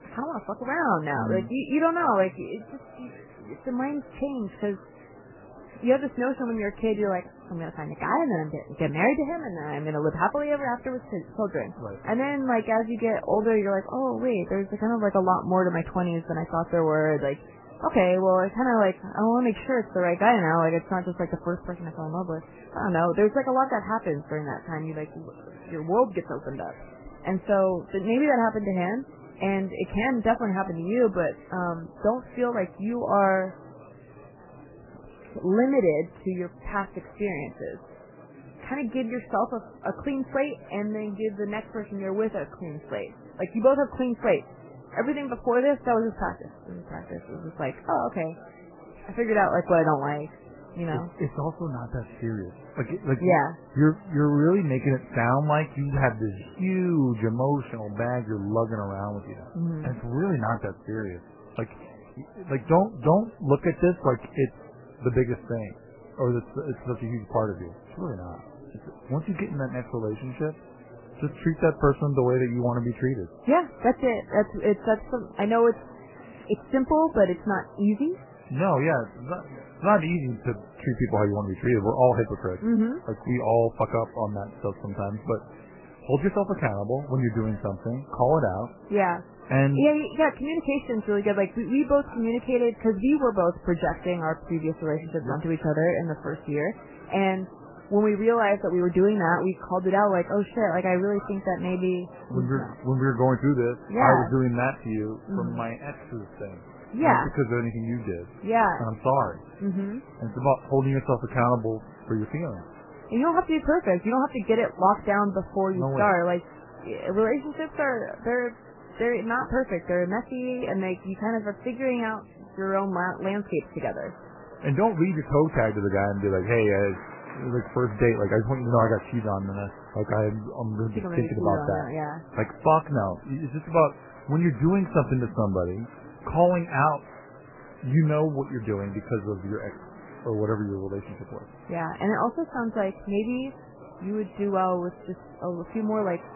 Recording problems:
garbled, watery; badly; nothing above 3 kHz
muffled; very slightly; fading above 2.5 kHz
murmuring crowd; faint; throughout; 20 dB below the speech

